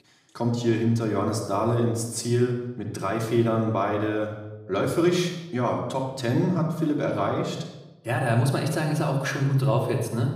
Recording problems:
room echo; noticeable; dies away in 0.8 s
off-mic speech; somewhat distant

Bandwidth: 14.5 kHz